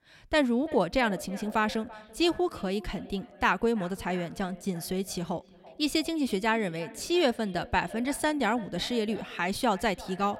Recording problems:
echo of what is said; noticeable; throughout; 340 ms later, 20 dB below the speech

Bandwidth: 16 kHz